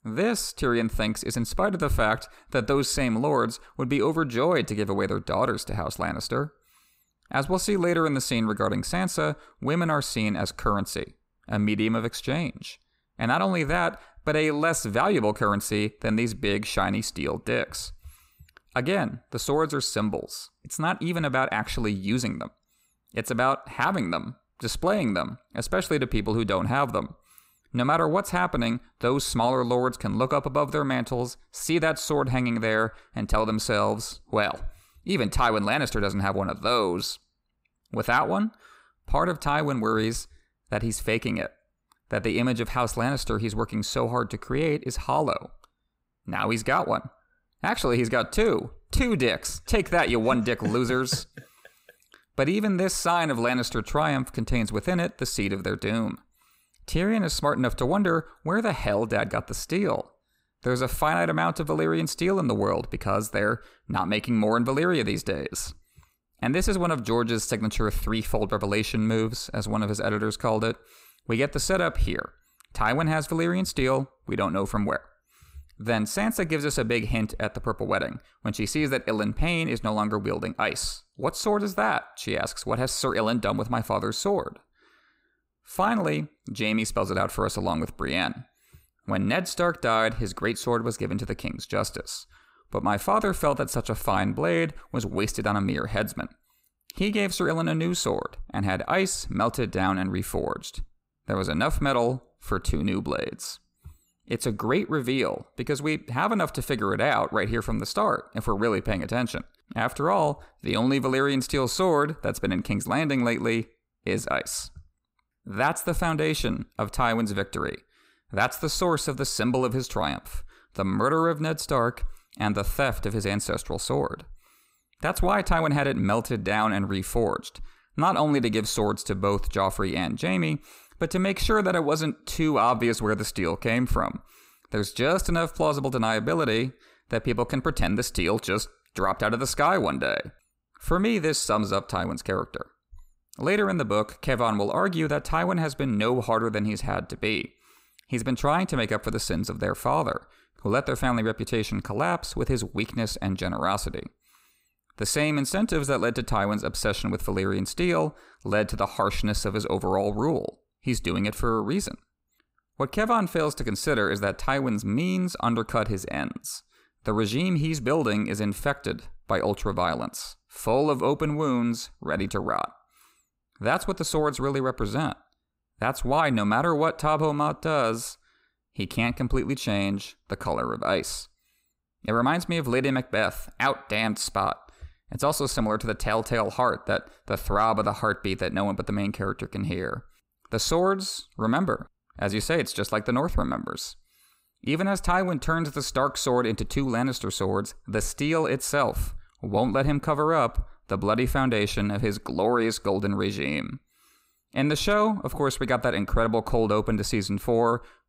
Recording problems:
none

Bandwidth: 15.5 kHz